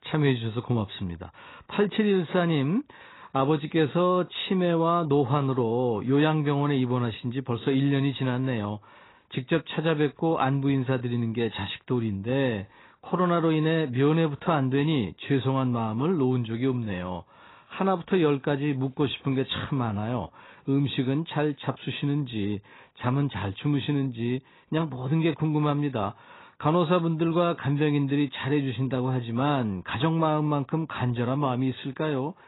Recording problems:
garbled, watery; badly; nothing above 4 kHz

